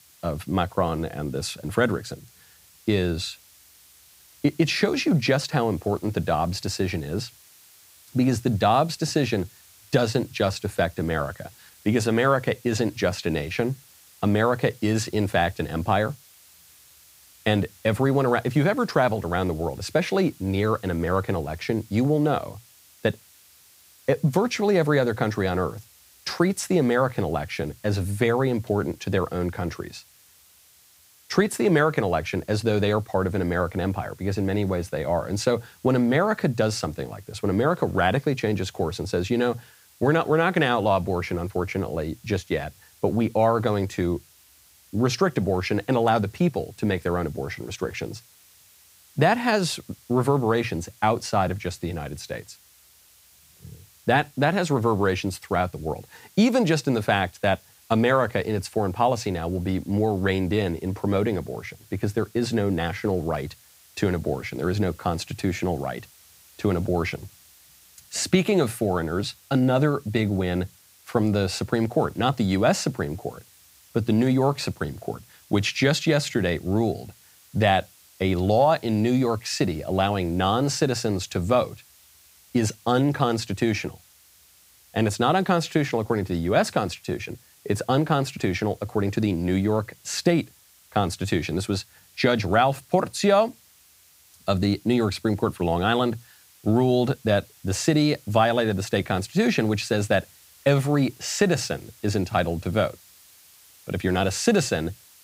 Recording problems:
hiss; faint; throughout; 25 dB below the speech

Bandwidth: 15.5 kHz